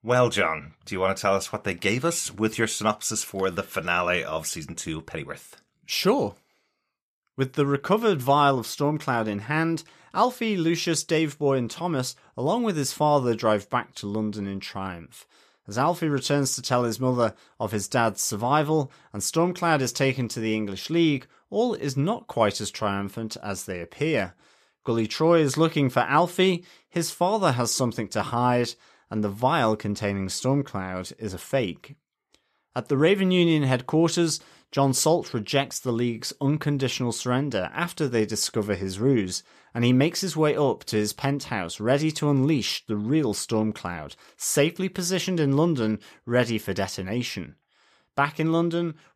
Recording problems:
none

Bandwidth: 14.5 kHz